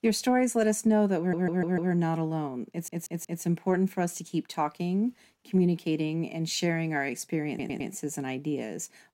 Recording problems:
audio stuttering; at 1 s, at 2.5 s and at 7.5 s

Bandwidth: 16 kHz